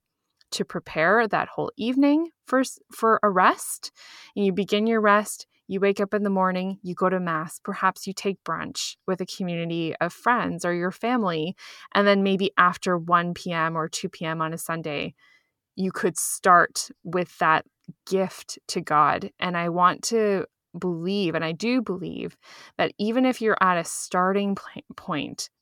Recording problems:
none

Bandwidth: 17.5 kHz